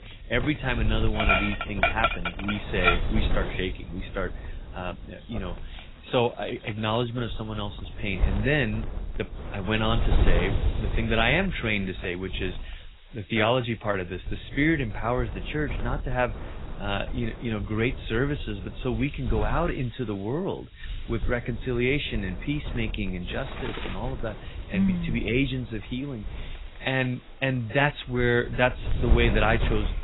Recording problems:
garbled, watery; badly; nothing above 4 kHz
animal sounds; loud; throughout; 2 dB below the speech
wind noise on the microphone; occasional gusts; 15 dB below the speech

